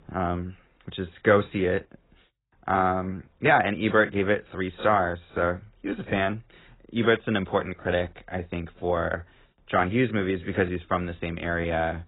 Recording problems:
garbled, watery; badly; nothing above 4 kHz

